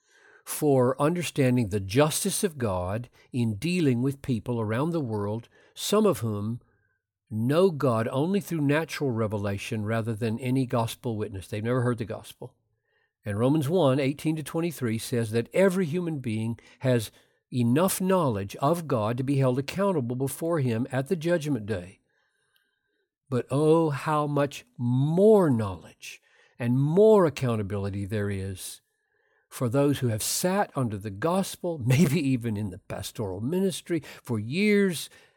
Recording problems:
none

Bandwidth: 18 kHz